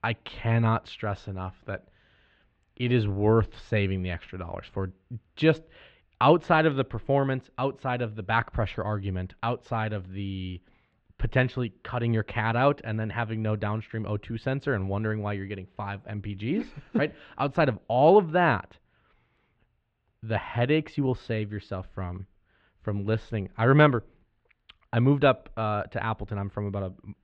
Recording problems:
muffled; slightly; fading above 3.5 kHz

